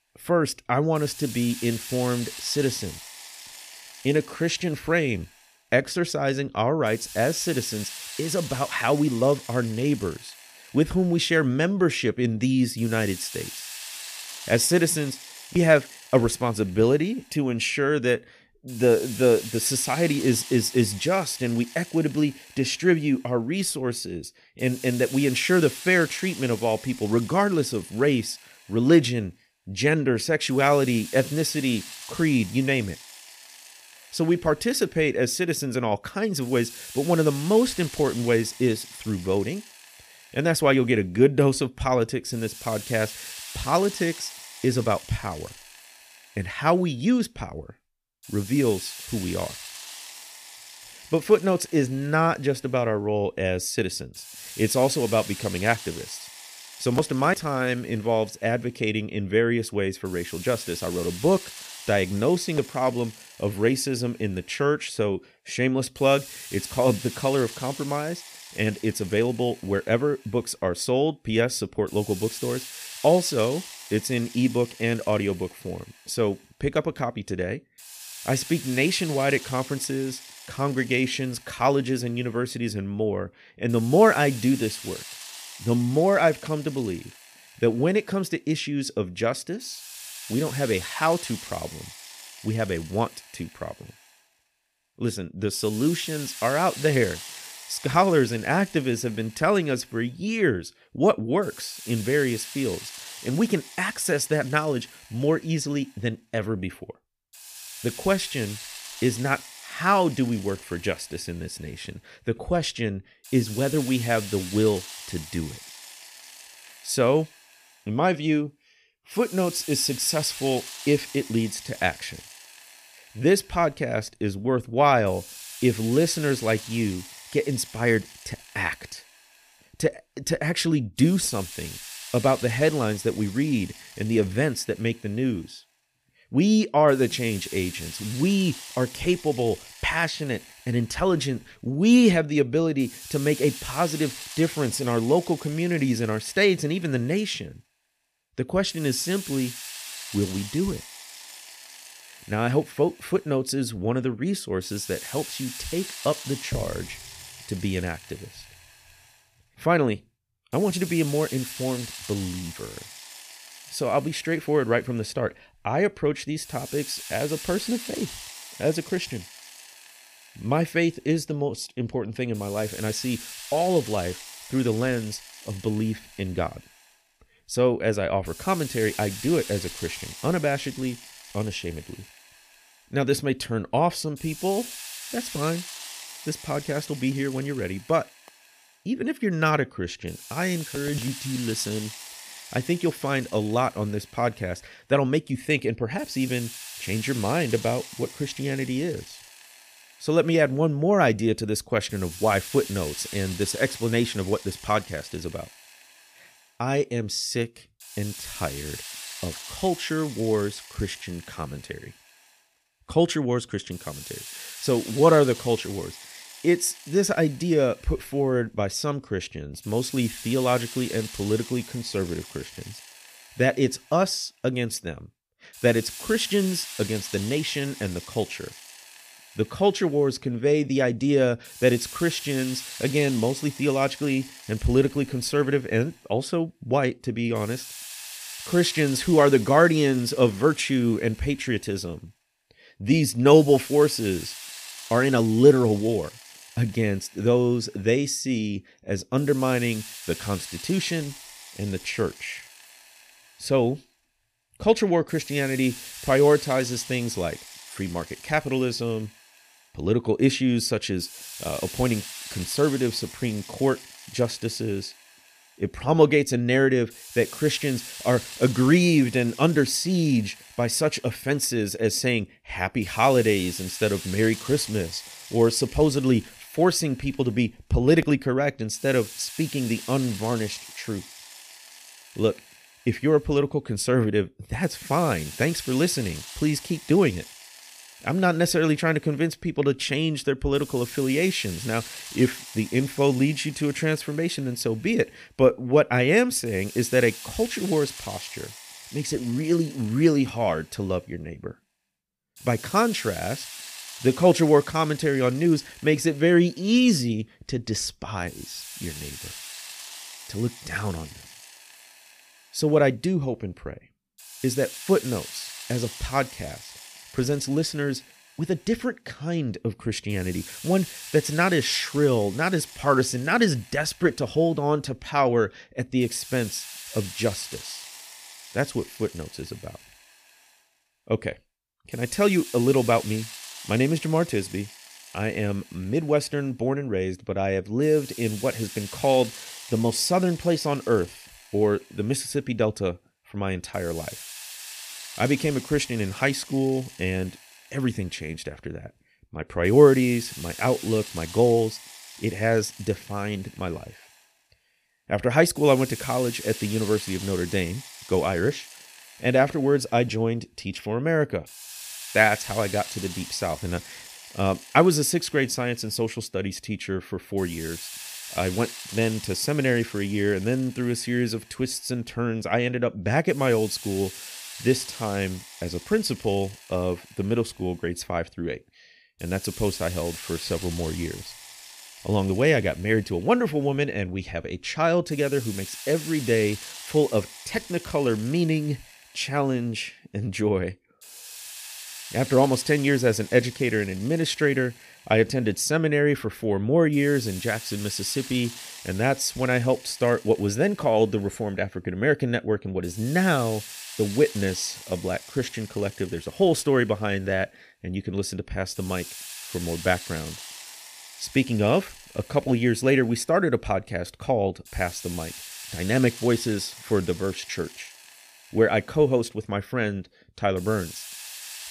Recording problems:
hiss; noticeable; throughout; 15 dB below the speech

